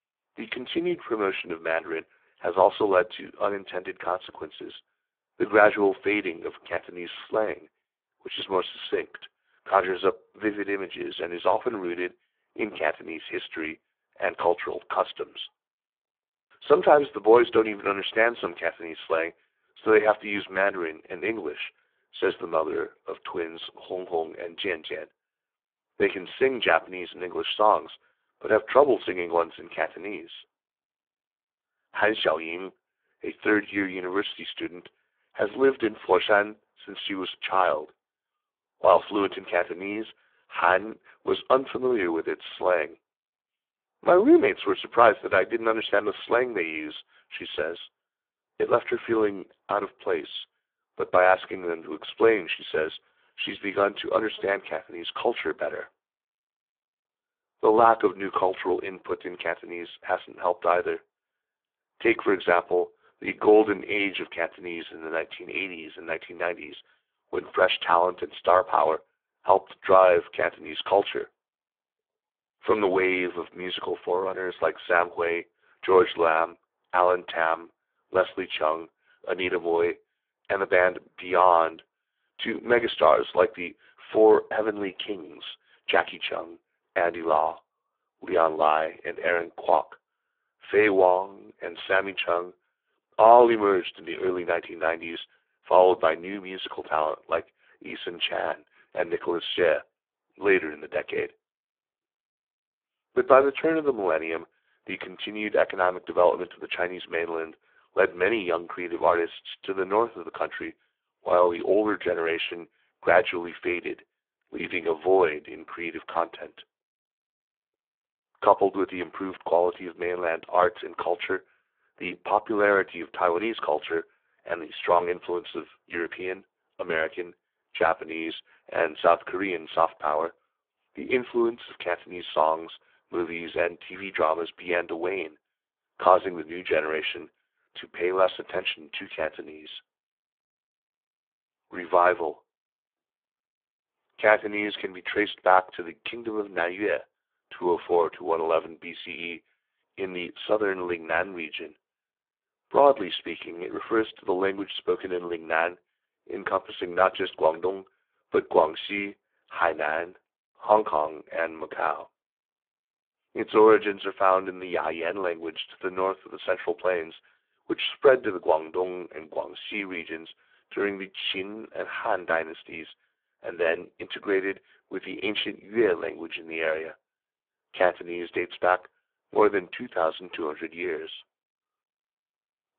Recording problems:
phone-call audio; poor line

